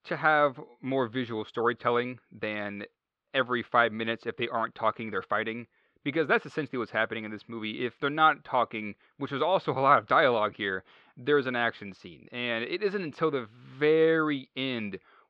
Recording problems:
muffled; slightly; fading above 4 kHz

